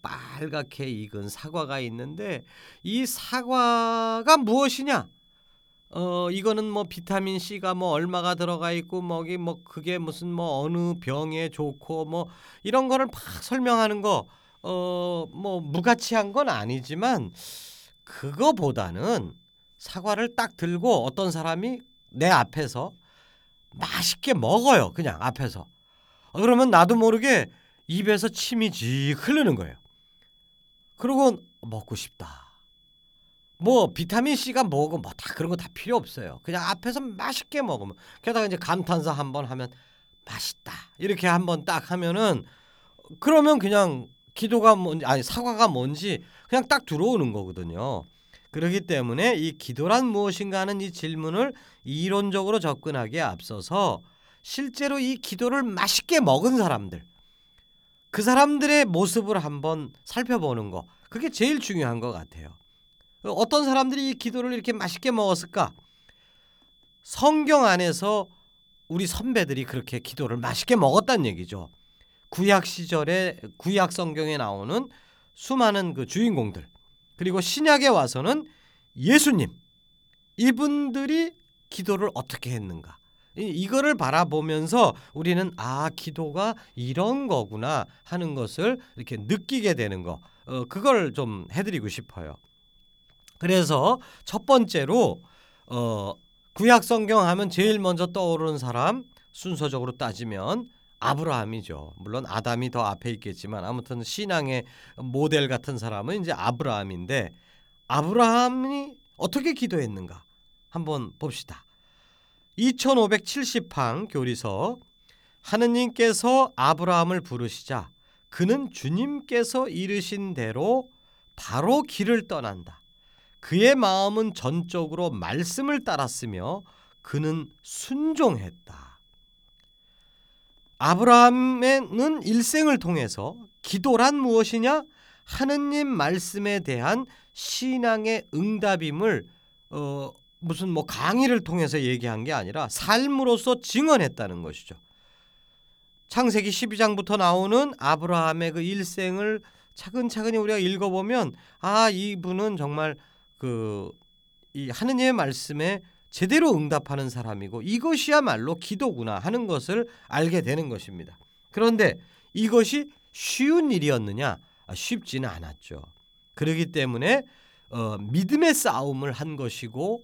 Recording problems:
high-pitched whine; faint; throughout; 3.5 kHz, 35 dB below the speech

